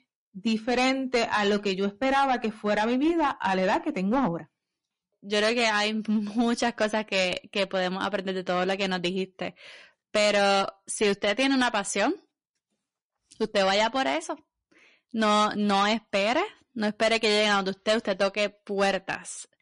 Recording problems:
distortion; slight; 6% of the sound clipped
garbled, watery; slightly; nothing above 10.5 kHz

